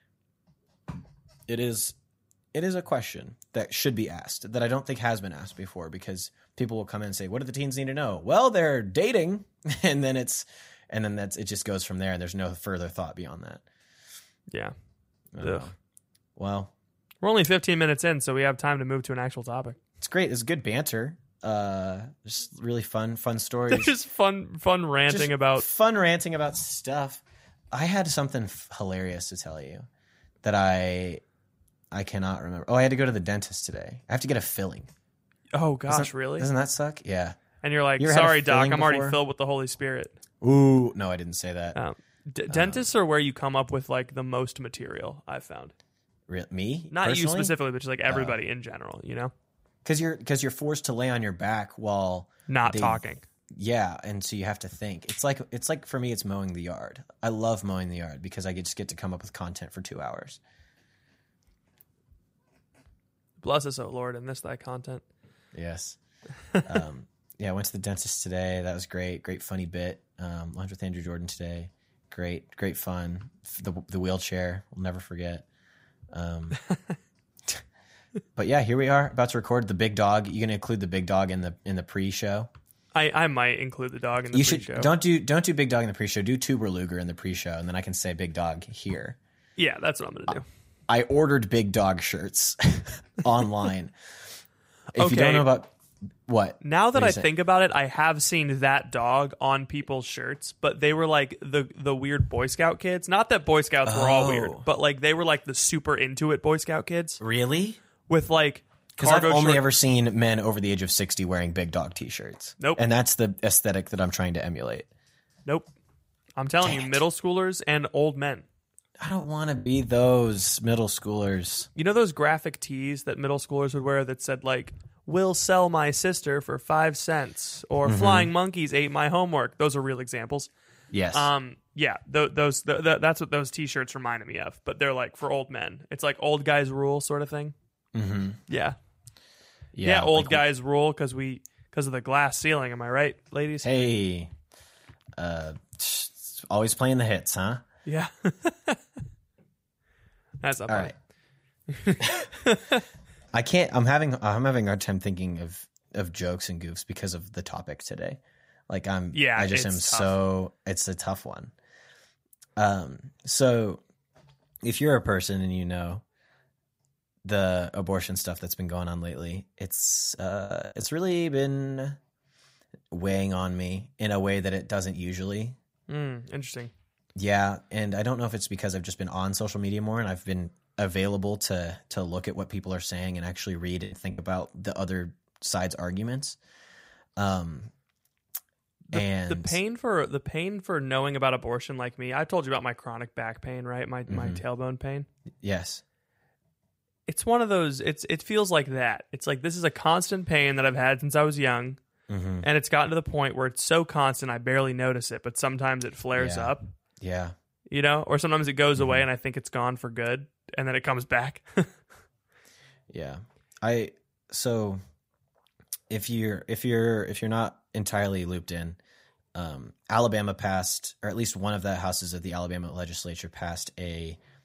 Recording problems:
choppy; very; at 1:59, from 2:50 to 2:51 and at 3:04; 8% of the speech affected

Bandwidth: 15.5 kHz